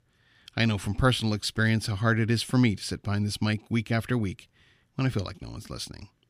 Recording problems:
none

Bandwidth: 15 kHz